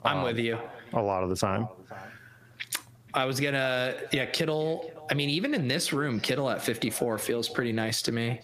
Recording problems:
squashed, flat; heavily
echo of what is said; faint; throughout; 480 ms later, 20 dB below the speech

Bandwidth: 15 kHz